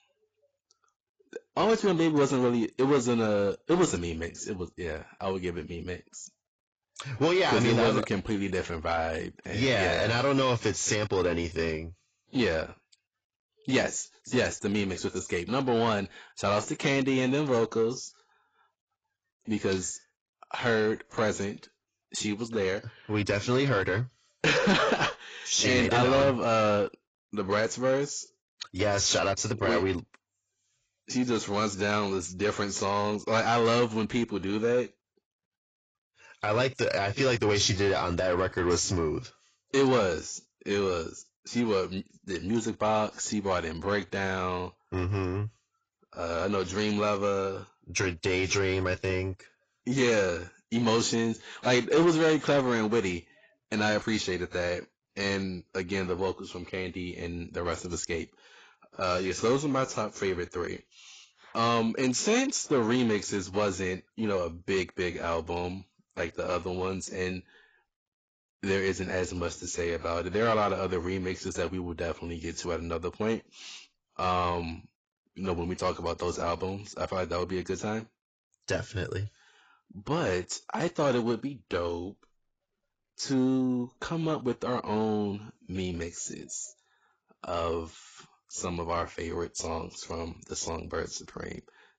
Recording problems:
garbled, watery; badly; nothing above 7.5 kHz
distortion; slight; 10 dB below the speech

